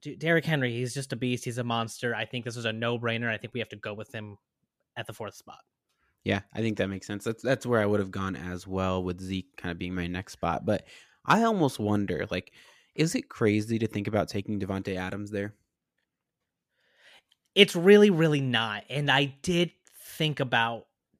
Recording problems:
none

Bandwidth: 14.5 kHz